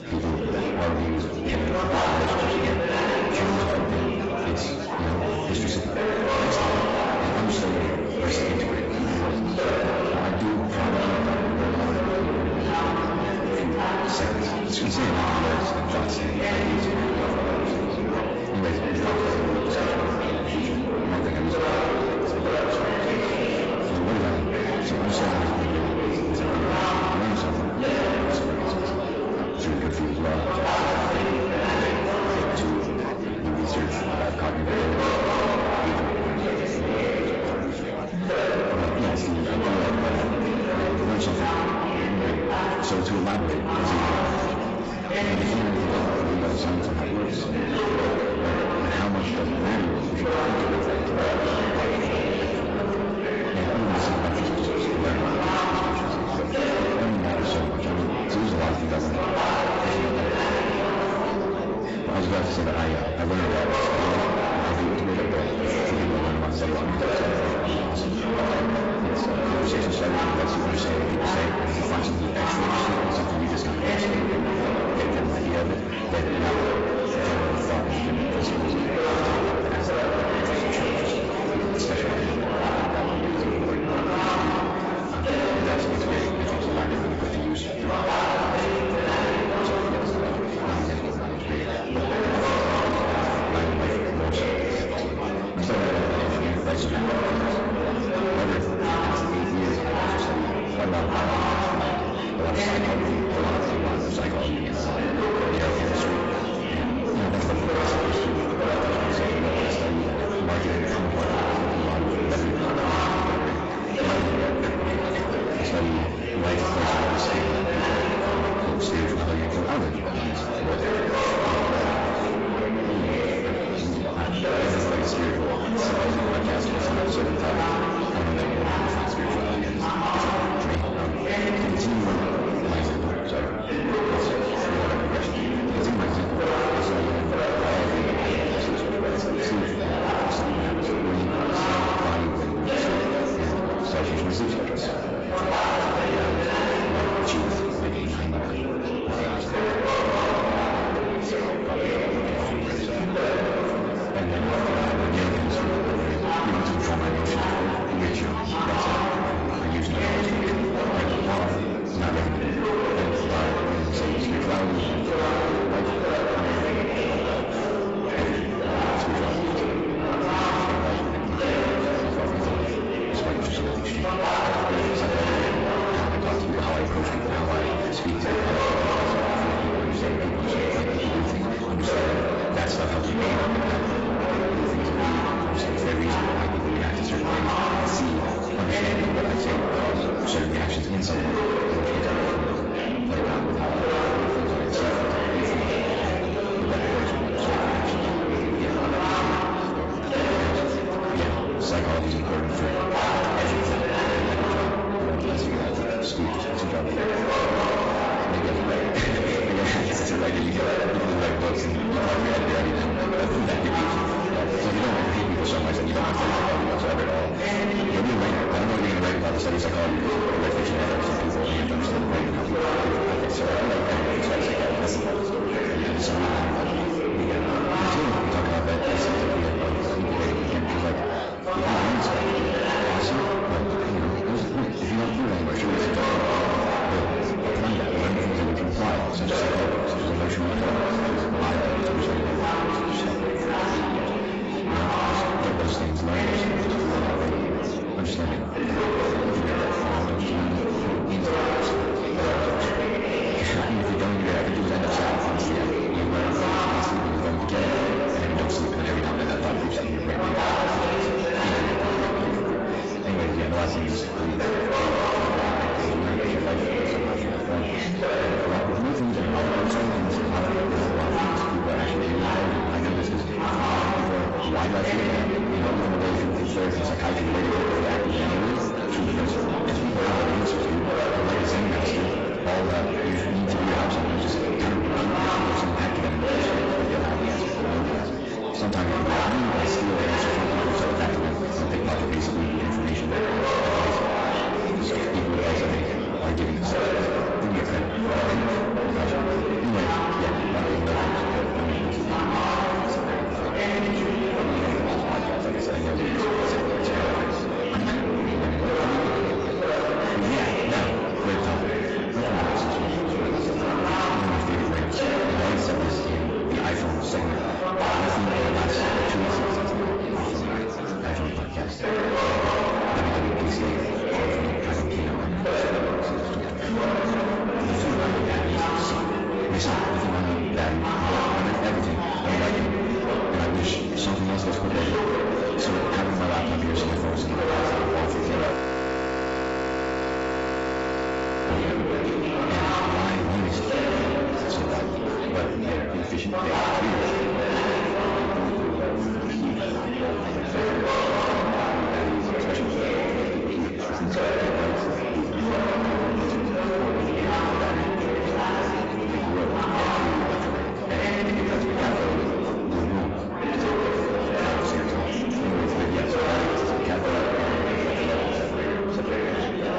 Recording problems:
distortion; heavy; 6 dB below the speech
garbled, watery; badly; nothing above 7.5 kHz
wrong speed, natural pitch; too fast; 1.5 times normal speed
room echo; very slight; dies away in 0.7 s
off-mic speech; somewhat distant
chatter from many people; very loud; throughout; 2 dB above the speech
audio freezing; at 5:39 for 3 s

